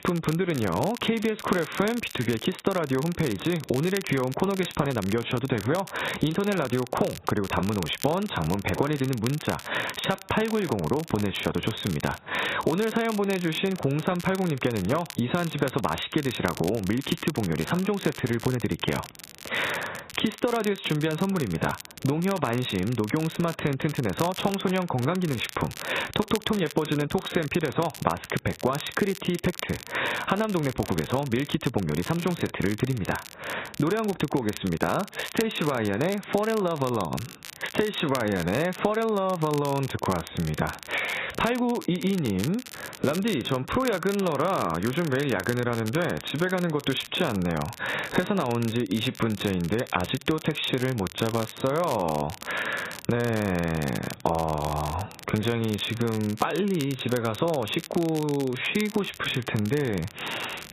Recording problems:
garbled, watery; badly; nothing above 4 kHz
squashed, flat; heavily
crackle, like an old record; noticeable; 15 dB below the speech

